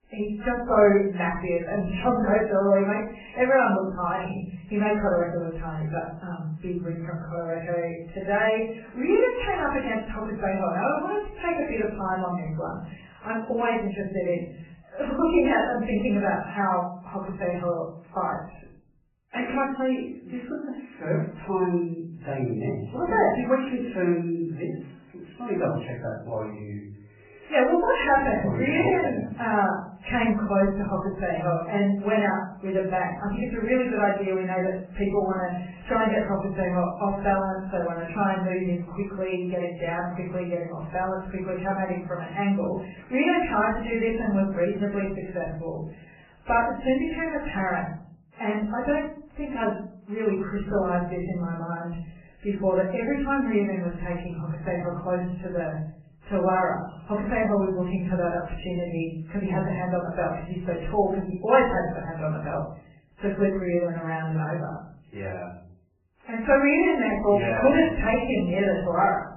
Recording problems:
off-mic speech; far
garbled, watery; badly; nothing above 3 kHz
room echo; slight; dies away in 0.5 s

